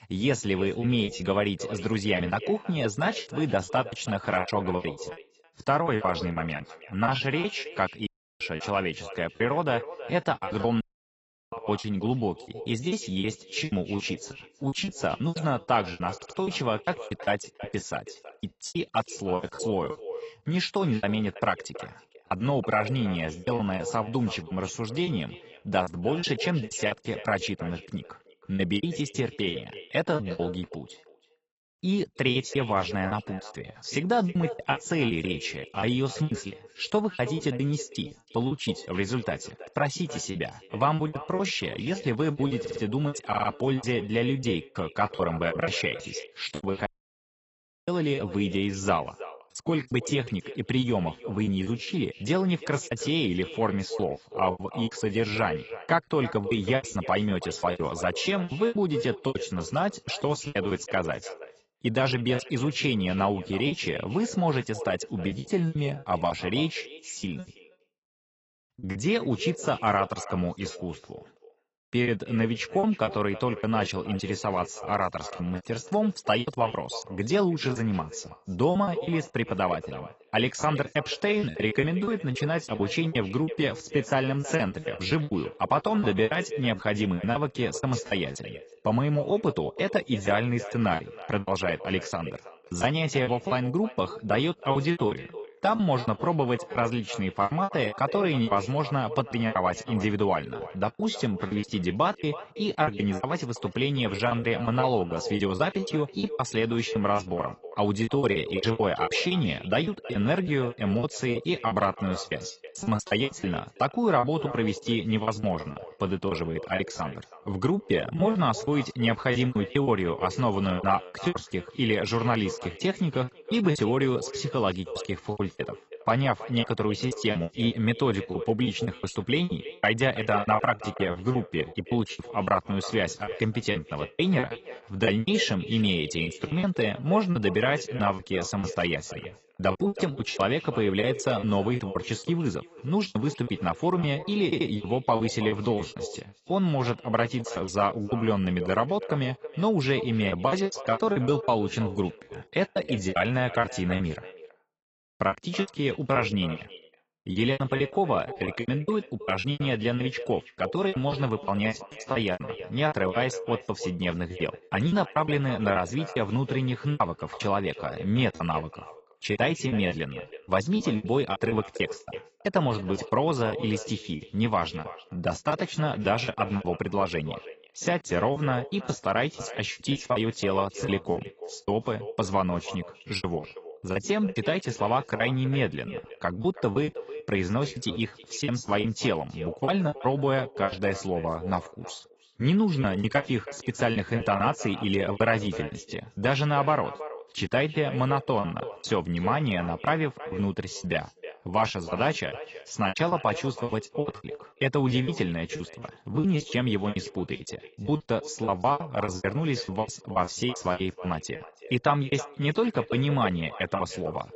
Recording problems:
garbled, watery; badly; nothing above 8 kHz
echo of what is said; noticeable; throughout; 320 ms later, 15 dB below the speech
choppy; very; 14% of the speech affected
audio cutting out; at 8 s, at 11 s for 0.5 s and at 47 s for 1 s
audio stuttering; 4 times, first at 16 s

